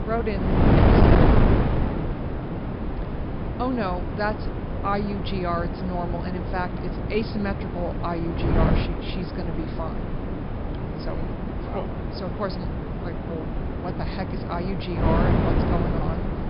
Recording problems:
high frequencies cut off; noticeable; nothing above 5.5 kHz
distortion; slight; 1.4% of the sound clipped
wind noise on the microphone; heavy; 1 dB above the speech

